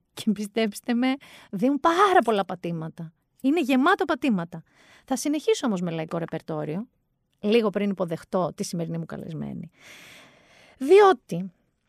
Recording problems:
none

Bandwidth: 15 kHz